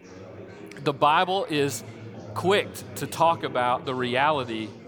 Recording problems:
chatter from many people; noticeable; throughout; 15 dB below the speech

